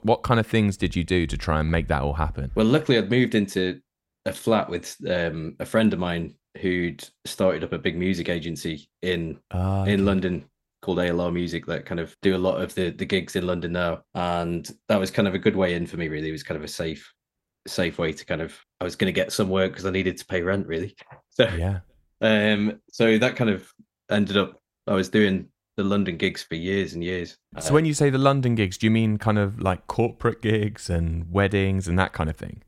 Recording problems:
none

